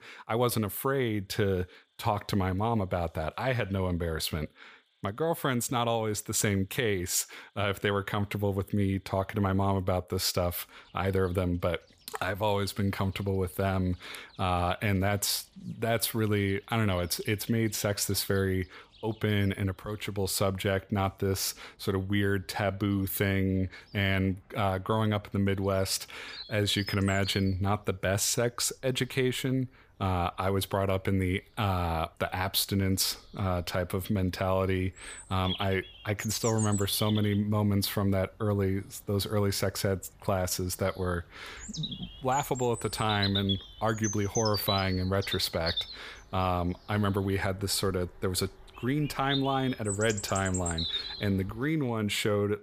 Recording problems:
animal sounds; loud; throughout; 7 dB below the speech

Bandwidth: 15 kHz